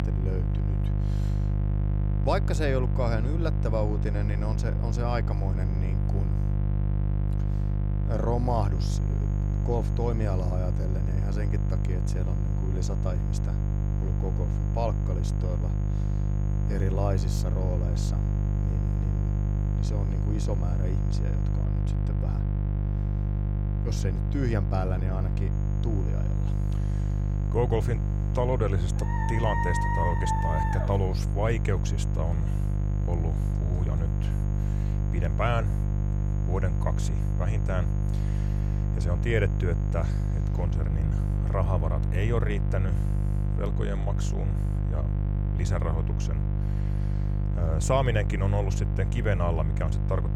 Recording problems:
electrical hum; loud; throughout; 50 Hz, 6 dB below the speech
high-pitched whine; faint; from 8.5 to 22 s and from 26 to 40 s; 6.5 kHz, 30 dB below the speech
dog barking; loud; from 29 to 31 s; peak 3 dB above the speech

